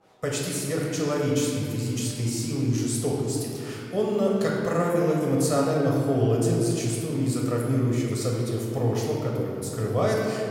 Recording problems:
room echo; noticeable; dies away in 2.2 s
off-mic speech; somewhat distant
murmuring crowd; faint; throughout; 30 dB below the speech

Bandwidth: 16 kHz